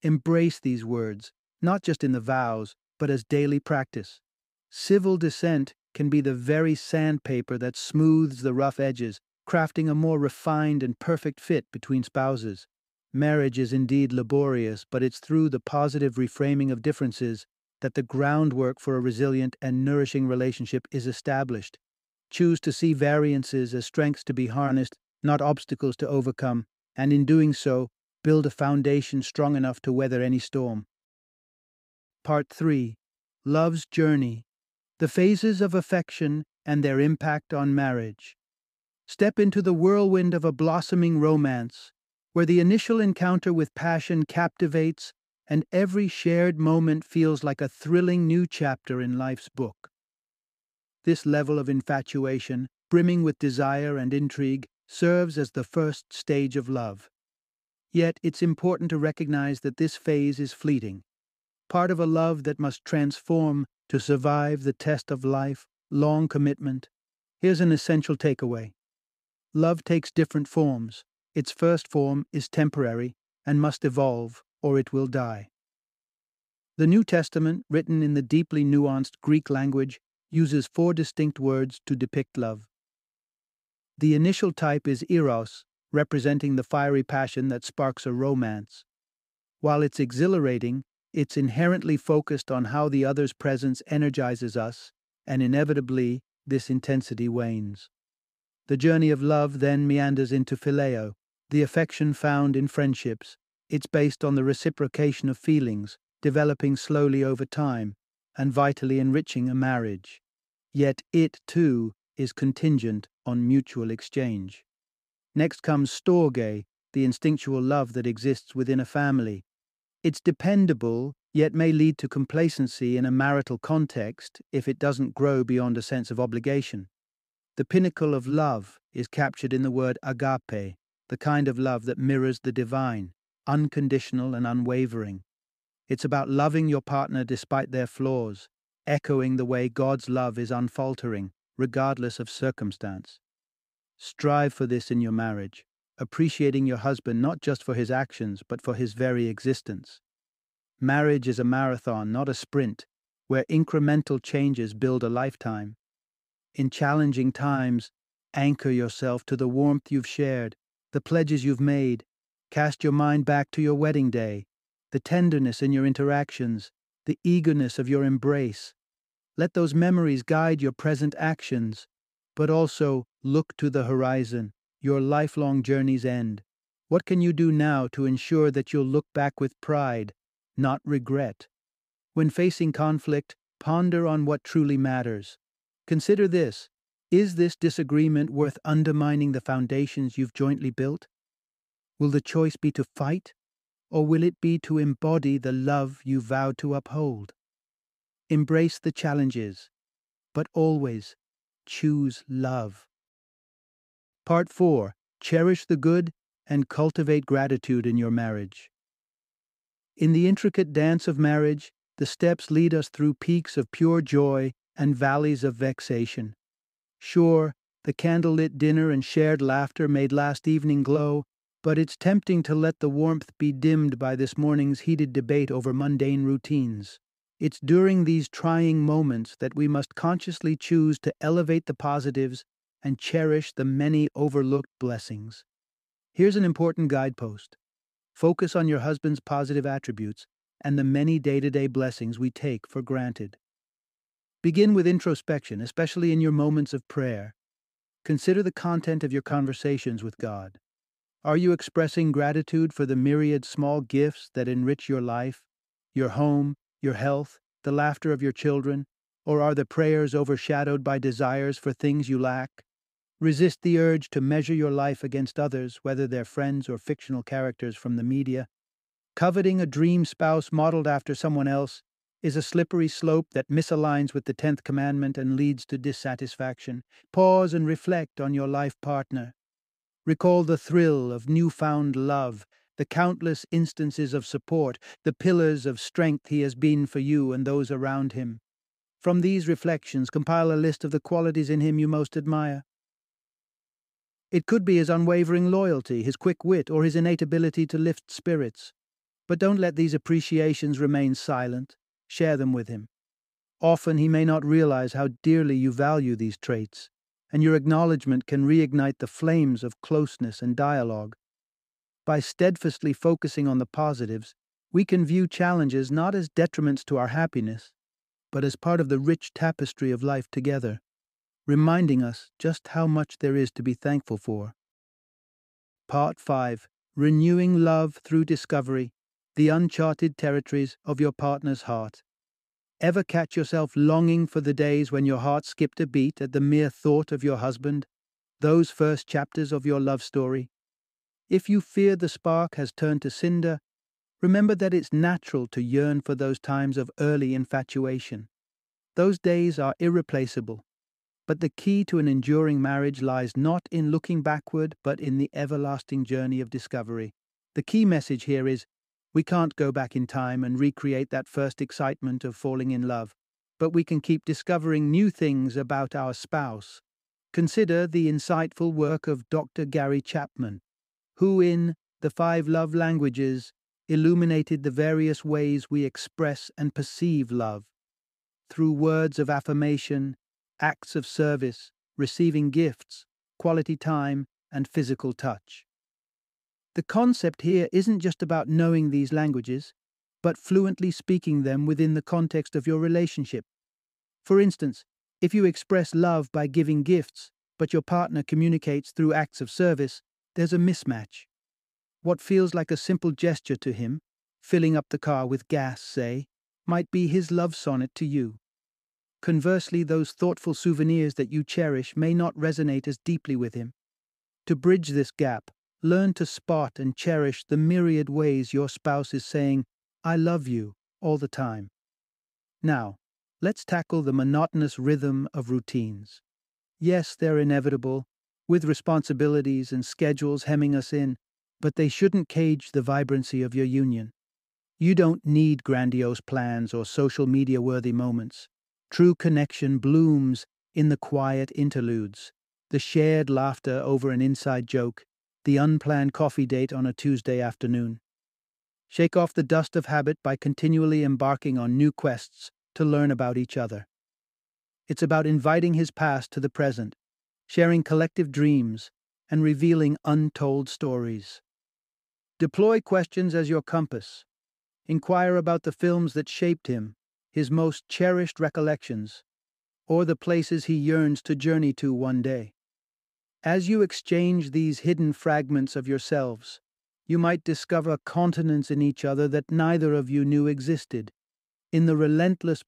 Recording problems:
none

